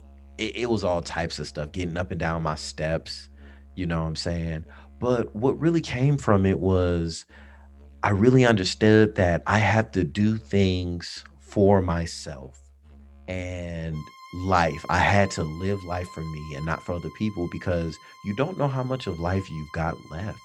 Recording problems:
background music; faint; throughout; 25 dB below the speech

